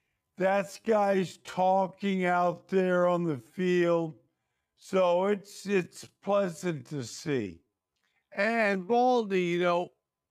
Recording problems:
wrong speed, natural pitch; too slow; 0.5 times normal speed

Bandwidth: 15 kHz